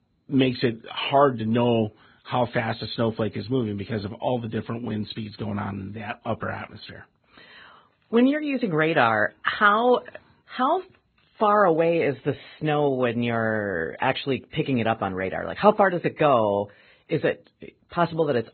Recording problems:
garbled, watery; badly; nothing above 4 kHz

